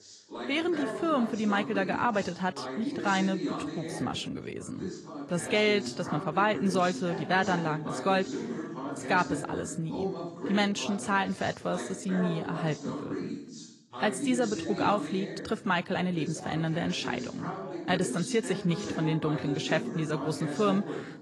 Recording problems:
garbled, watery; slightly
background chatter; loud; throughout; 2 voices, 7 dB below the speech

